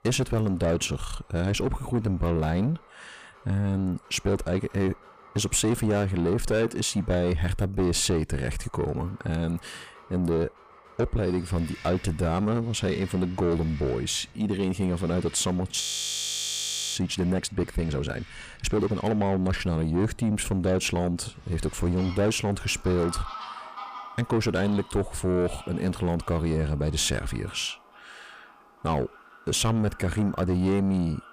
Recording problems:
distortion; slight; 10 dB below the speech
animal sounds; faint; throughout; 20 dB below the speech
audio freezing; at 16 s for 1 s

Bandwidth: 15 kHz